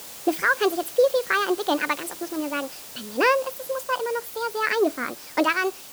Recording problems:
wrong speed and pitch; too fast and too high; 1.5 times normal speed
hiss; noticeable; throughout; 15 dB below the speech

